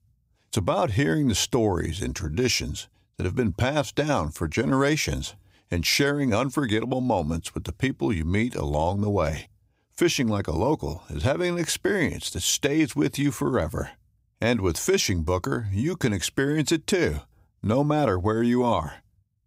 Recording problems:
none

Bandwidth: 15.5 kHz